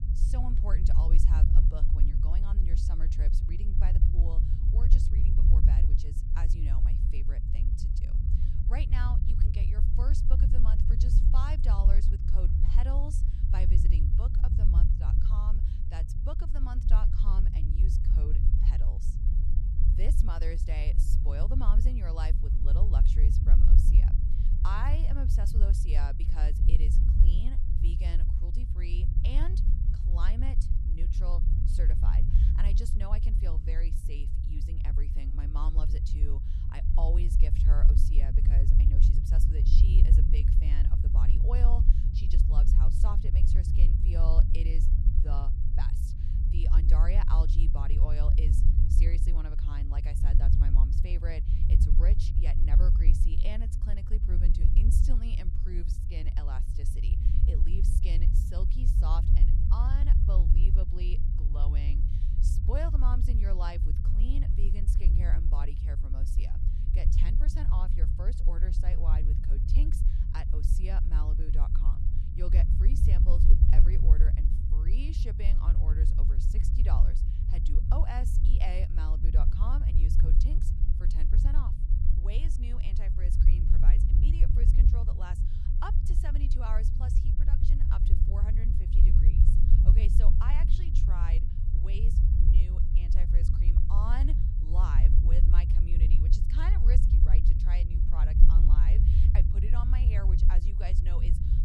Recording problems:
low rumble; loud; throughout; 1 dB below the speech

